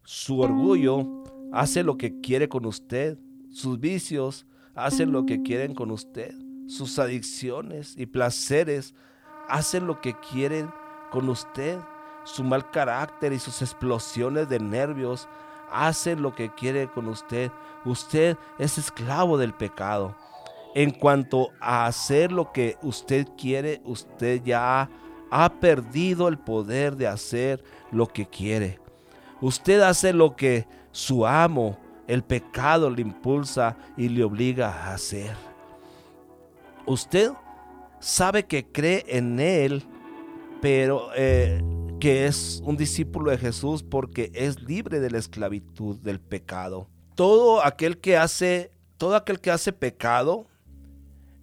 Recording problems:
background music; noticeable; throughout; 10 dB below the speech

